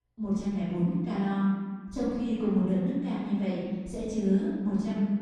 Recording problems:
room echo; strong; dies away in 1.5 s
off-mic speech; far

